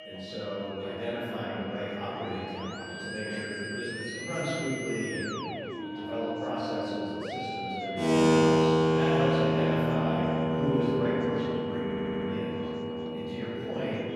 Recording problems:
room echo; strong; dies away in 2.6 s
off-mic speech; far
background music; very loud; throughout; 5 dB above the speech
high-pitched whine; noticeable; throughout; 3 kHz, 15 dB below the speech
chatter from many people; noticeable; throughout; 15 dB below the speech
audio stuttering; at 12 s

